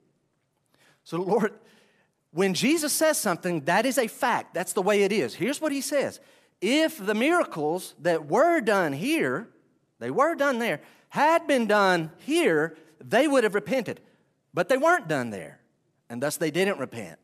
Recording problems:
none

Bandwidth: 14.5 kHz